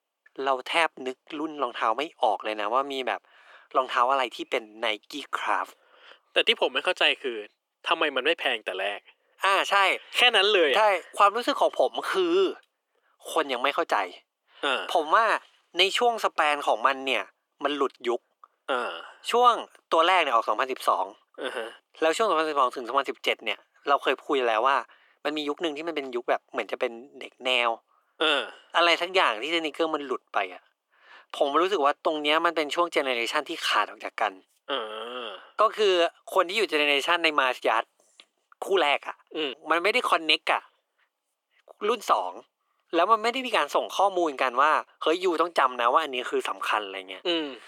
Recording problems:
thin; very; fading below 350 Hz

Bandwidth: 18 kHz